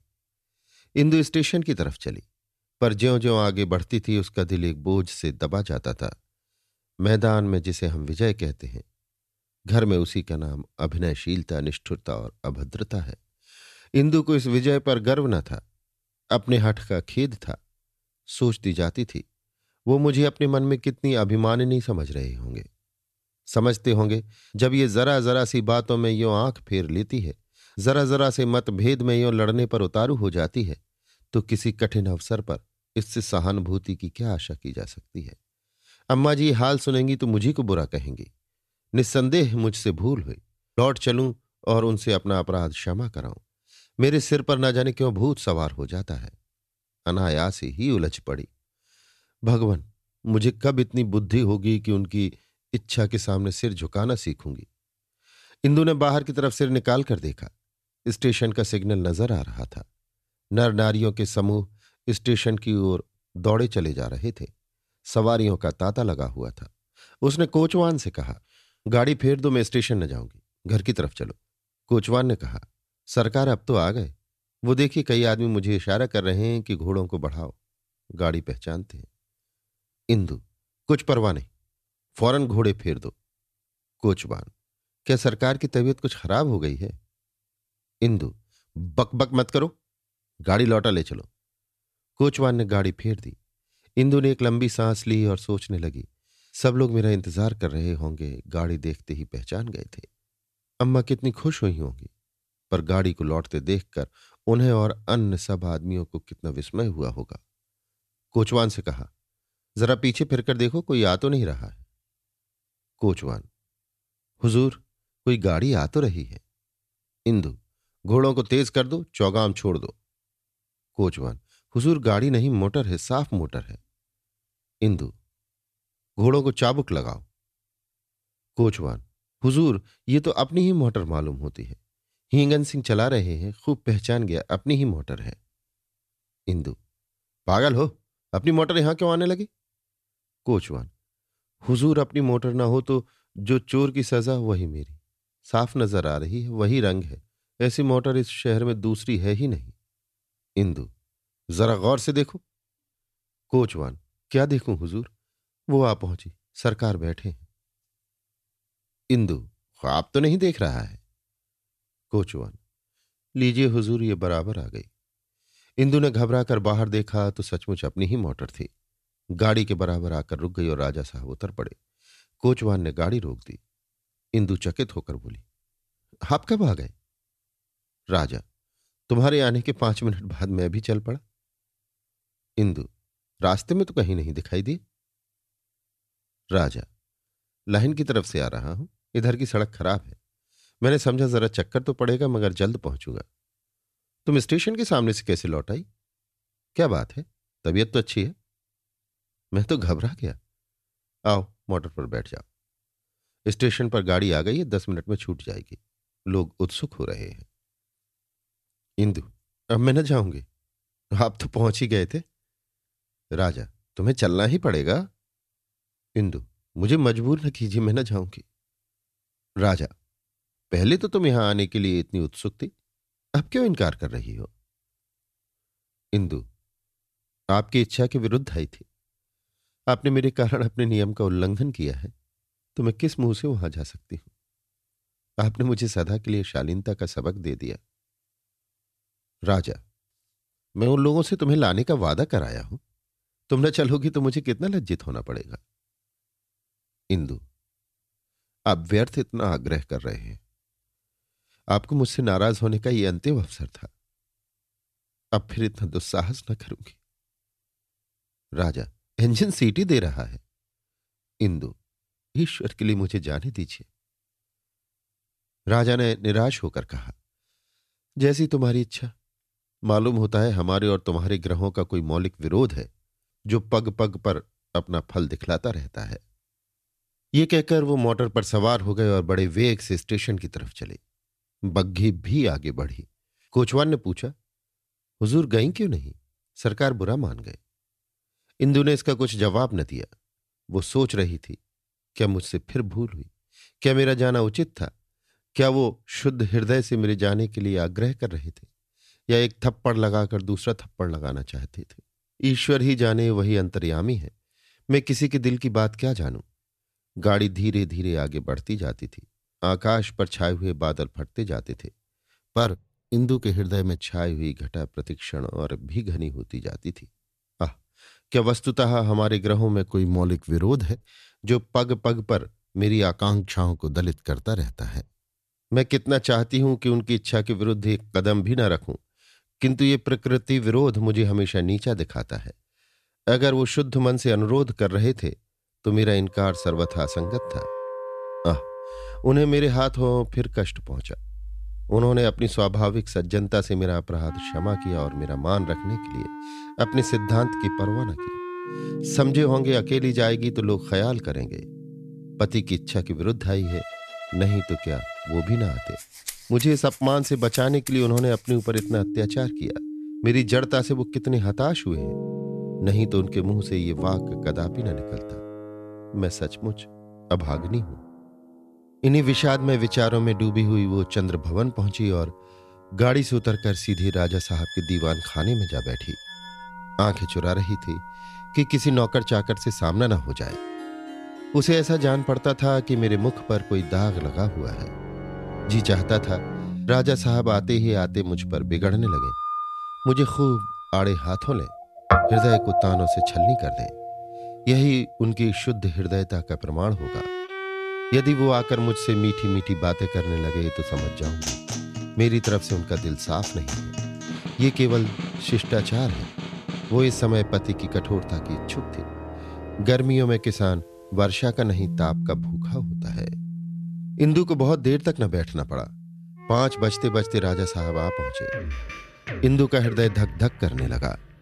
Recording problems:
background music; loud; from 5:36 on; 9 dB below the speech

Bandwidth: 14 kHz